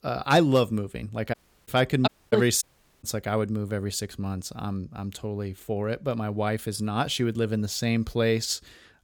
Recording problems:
audio cutting out; at 1.5 s, at 2 s and at 2.5 s

